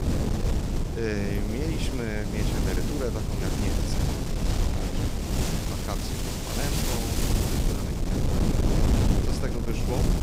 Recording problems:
wind noise on the microphone; heavy; 4 dB above the speech

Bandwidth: 15.5 kHz